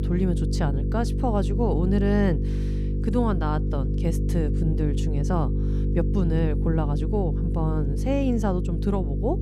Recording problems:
electrical hum; loud; throughout; 50 Hz, 6 dB below the speech

